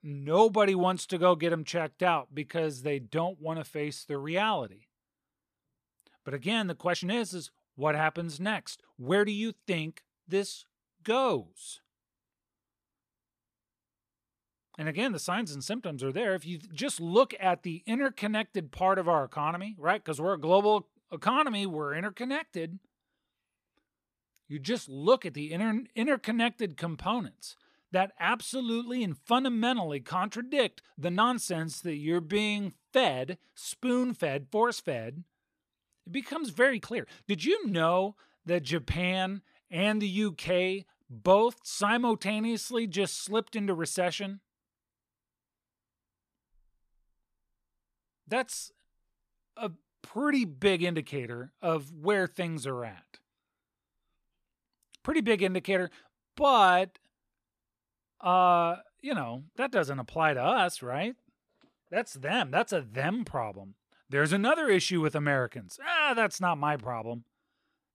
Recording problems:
uneven, jittery; strongly; from 7 s to 1:00

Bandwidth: 14.5 kHz